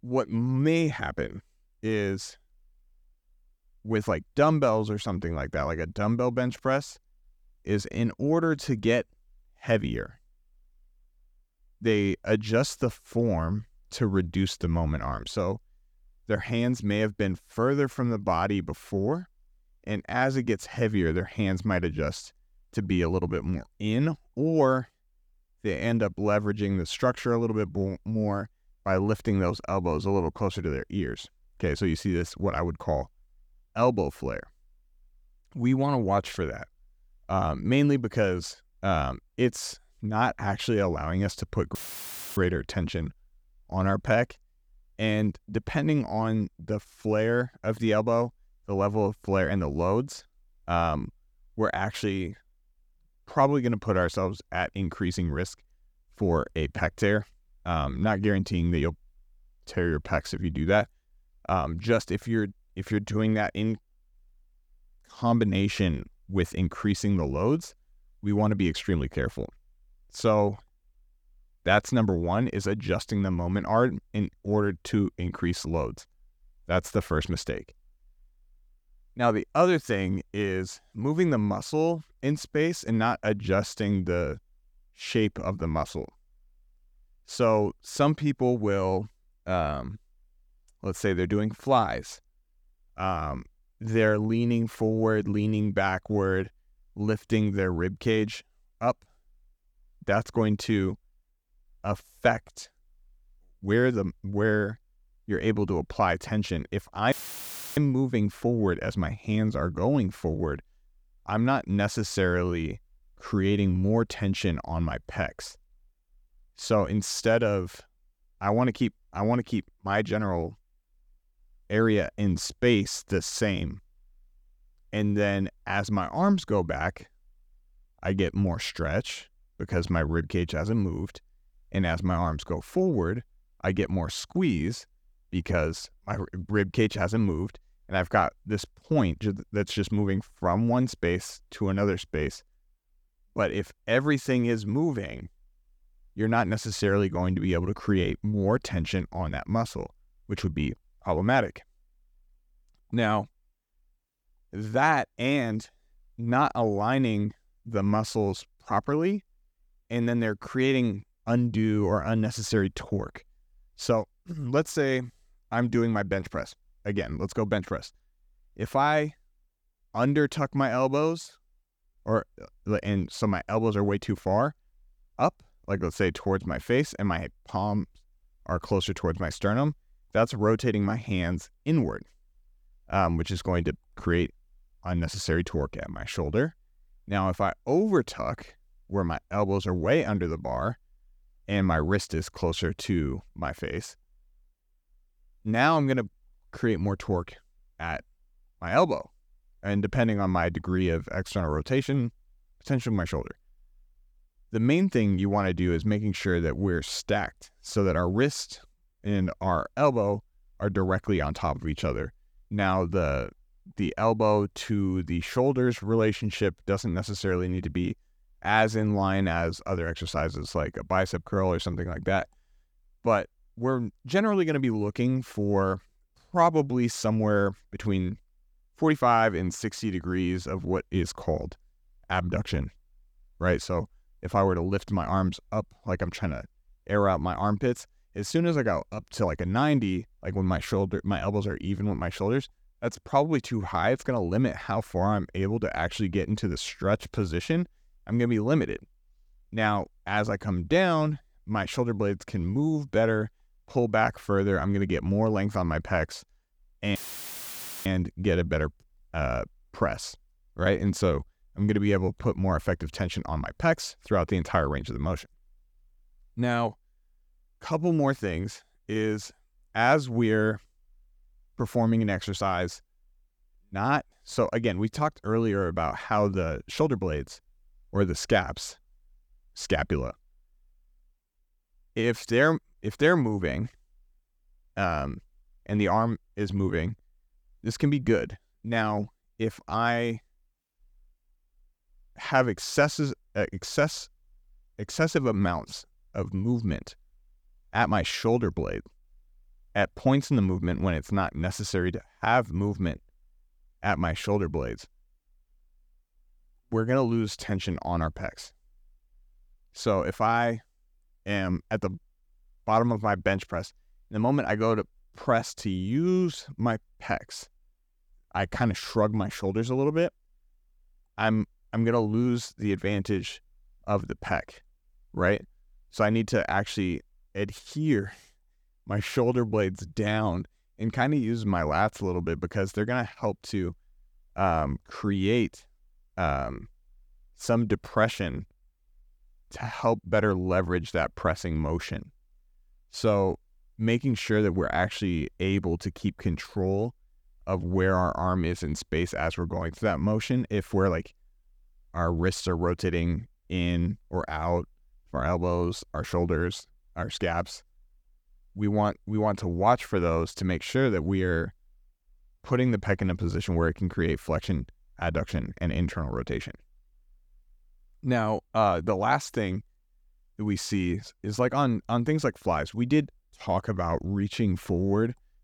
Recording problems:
audio cutting out; filled with static; at 42 s for 0.5 s, at 1:47 for 0.5 s and at 4:17 for 1 s

